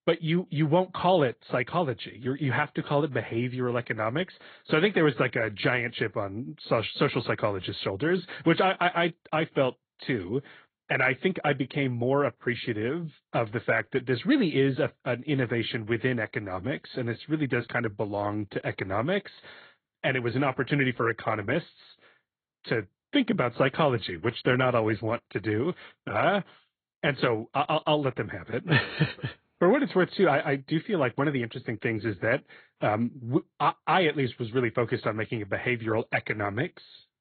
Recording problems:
high frequencies cut off; severe; nothing above 4 kHz
garbled, watery; slightly

